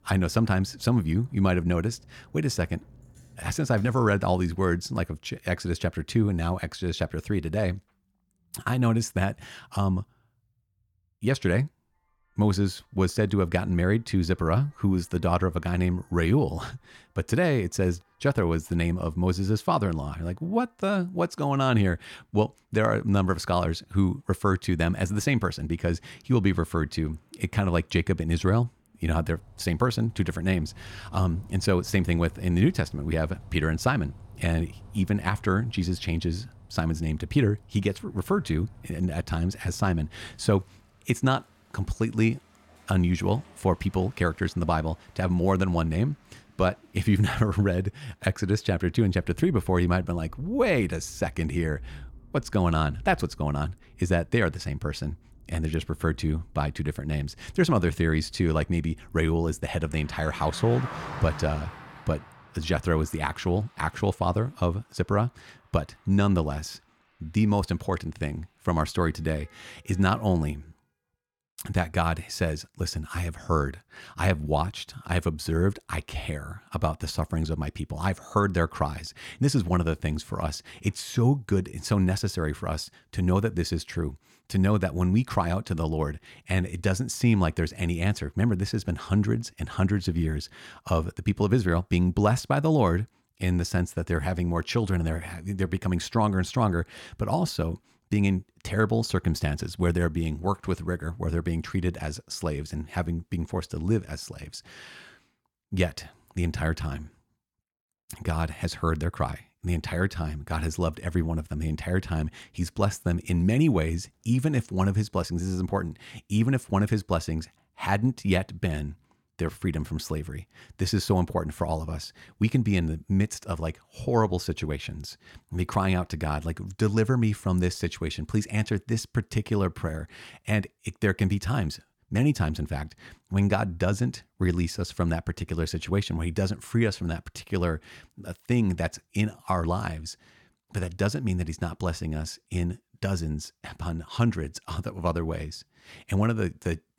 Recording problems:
traffic noise; faint; until 1:10; 20 dB below the speech

